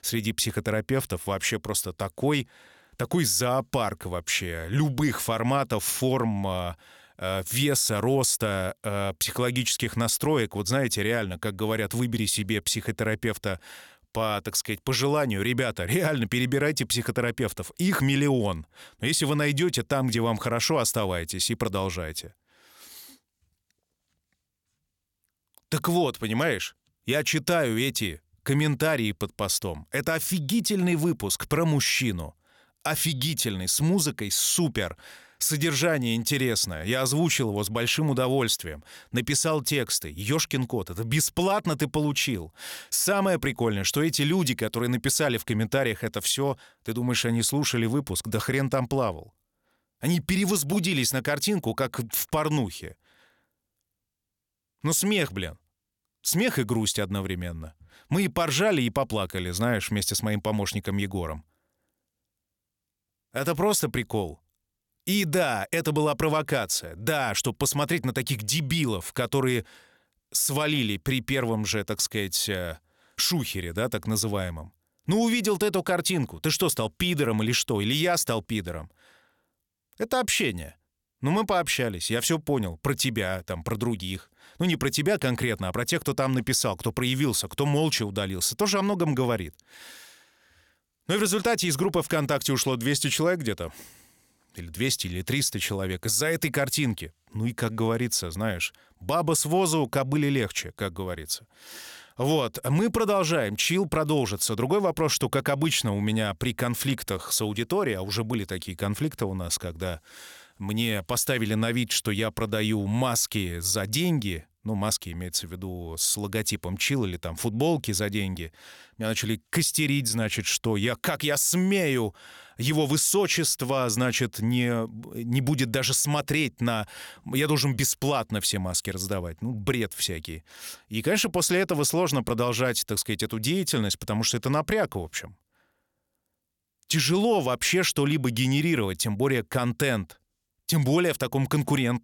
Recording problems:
none

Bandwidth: 17.5 kHz